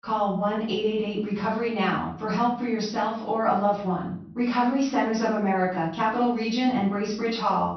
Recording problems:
off-mic speech; far
room echo; noticeable; dies away in 0.5 s
high frequencies cut off; noticeable; nothing above 6 kHz

